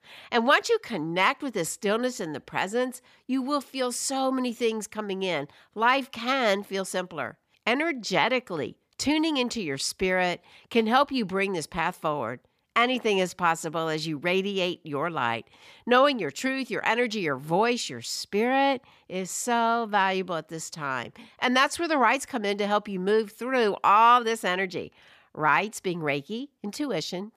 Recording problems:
none

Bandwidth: 15 kHz